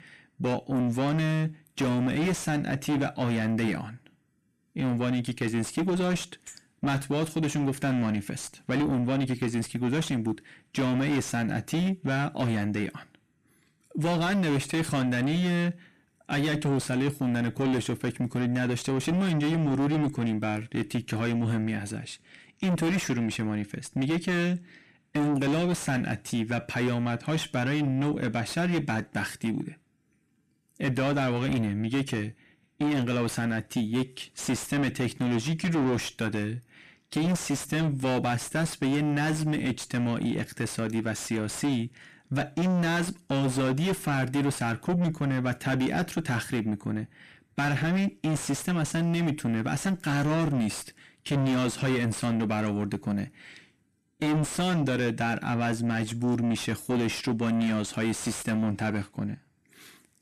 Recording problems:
distortion; heavy; 6 dB below the speech

